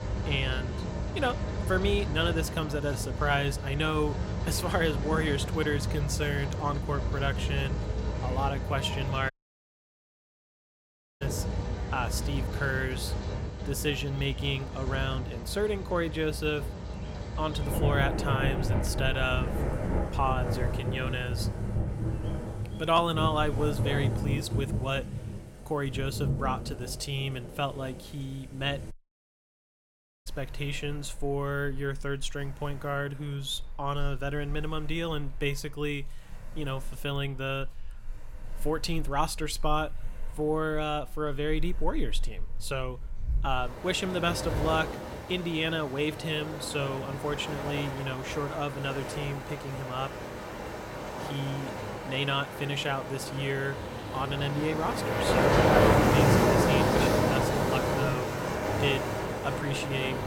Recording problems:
rain or running water; very loud; throughout; as loud as the speech
animal sounds; faint; throughout; 30 dB below the speech
audio cutting out; at 9.5 s for 2 s and at 29 s for 1.5 s

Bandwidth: 16 kHz